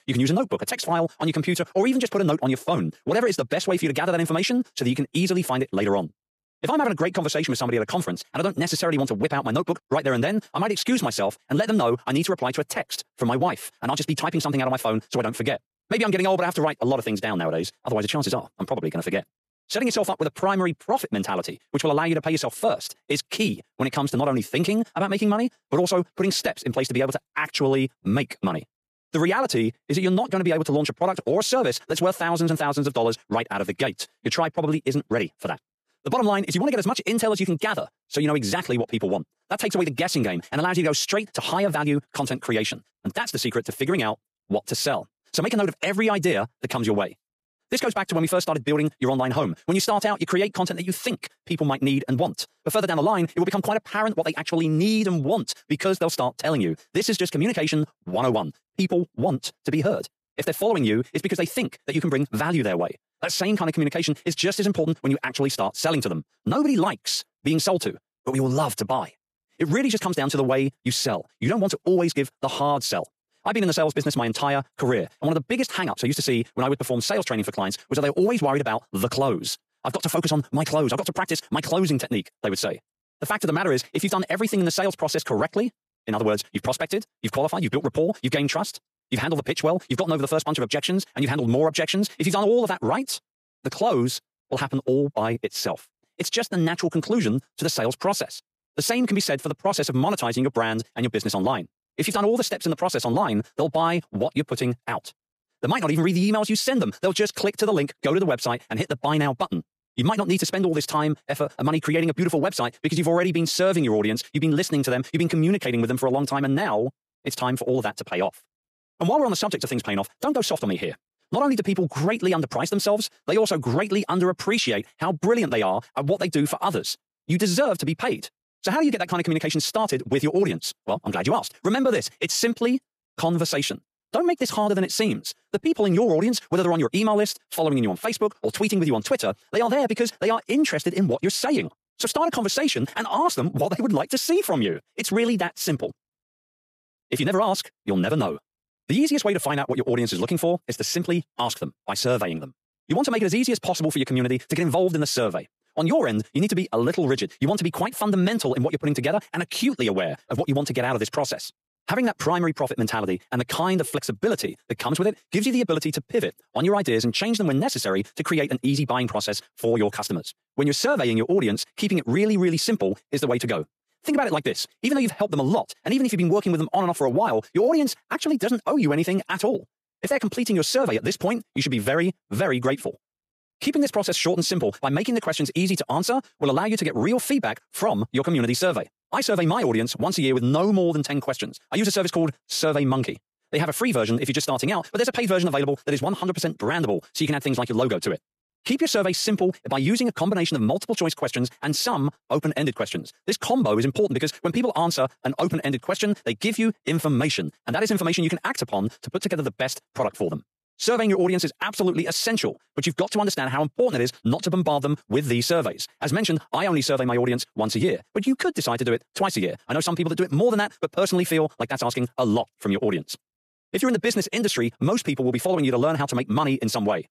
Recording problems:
wrong speed, natural pitch; too fast; 1.7 times normal speed

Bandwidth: 14.5 kHz